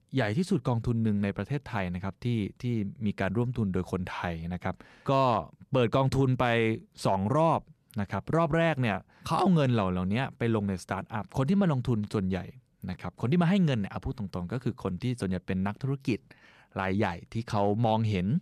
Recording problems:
none

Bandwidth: 13.5 kHz